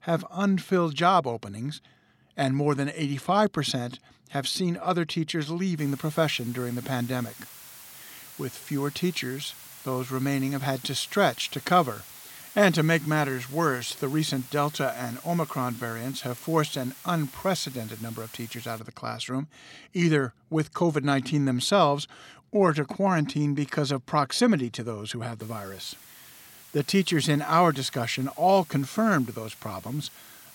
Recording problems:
hiss; noticeable; from 6 to 19 s and from 25 s on; 15 dB below the speech

